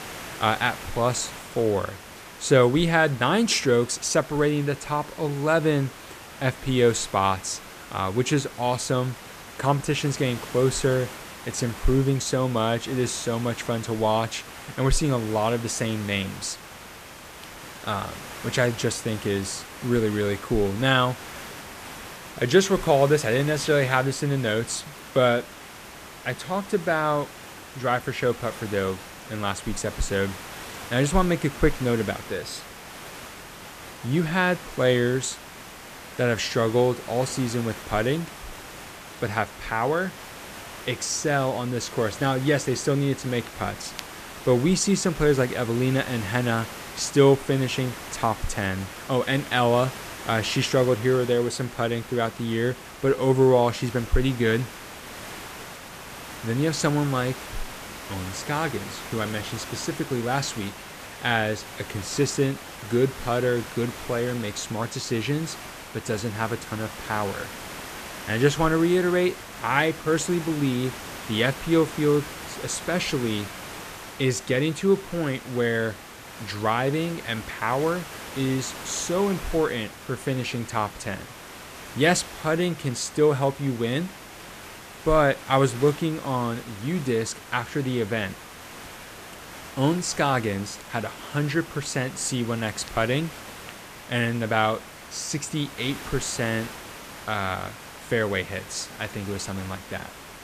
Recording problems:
hiss; noticeable; throughout; 15 dB below the speech

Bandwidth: 14.5 kHz